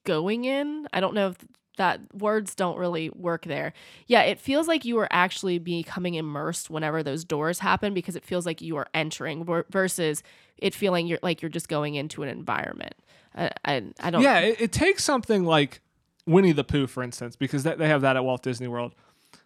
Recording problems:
none

